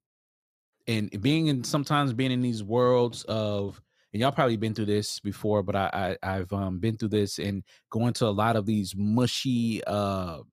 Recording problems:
none

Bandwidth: 14.5 kHz